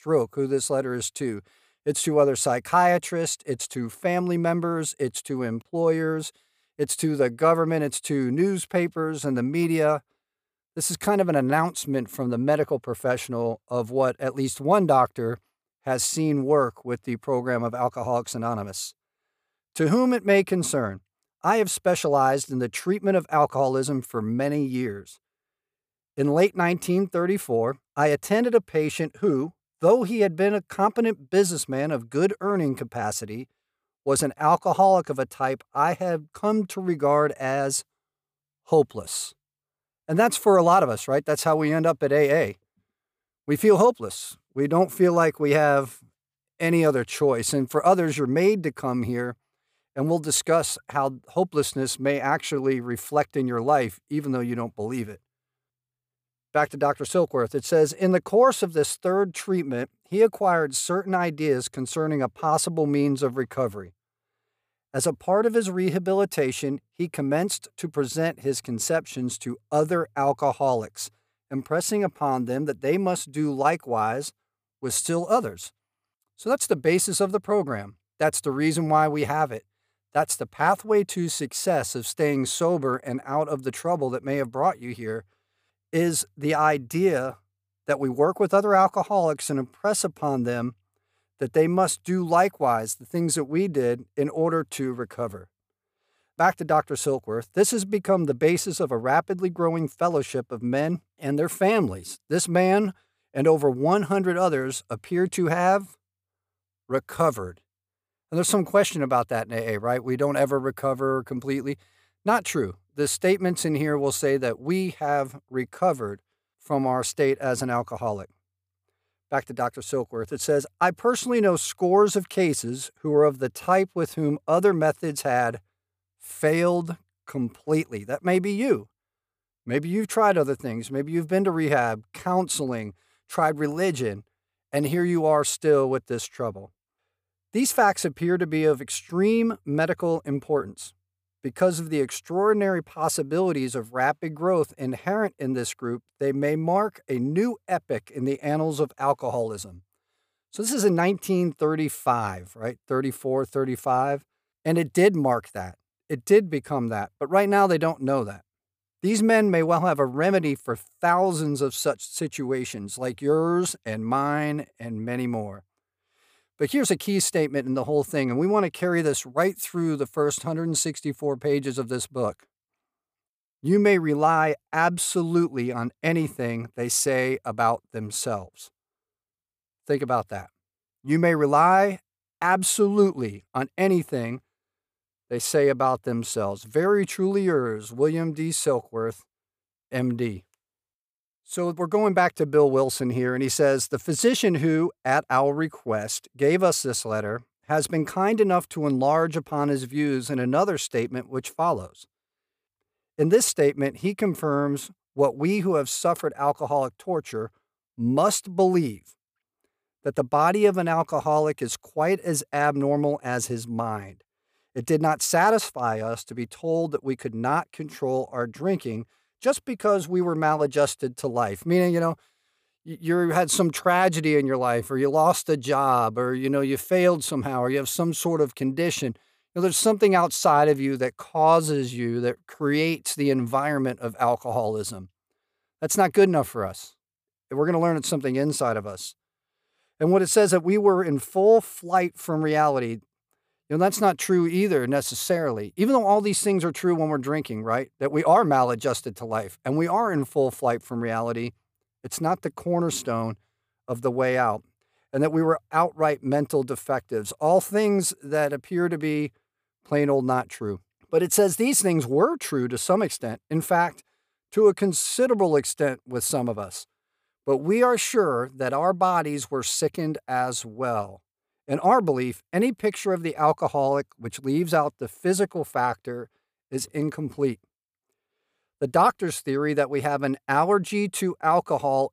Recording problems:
none

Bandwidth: 15 kHz